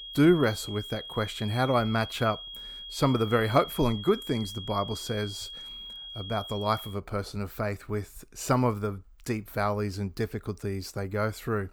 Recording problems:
high-pitched whine; noticeable; until 7 s; 3.5 kHz, 10 dB below the speech

